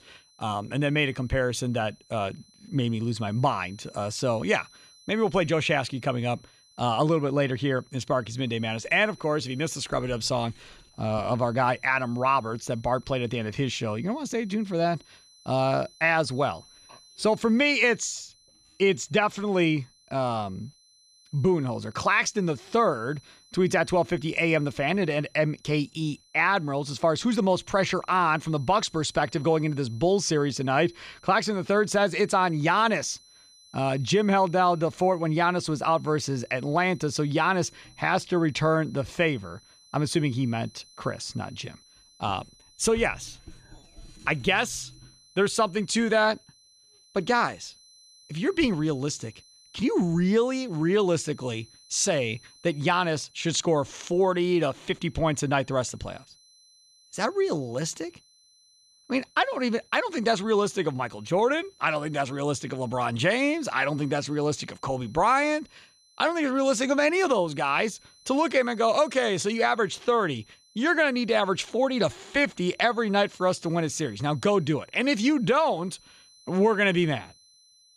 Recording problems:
high-pitched whine; faint; throughout; 4 kHz, 30 dB below the speech

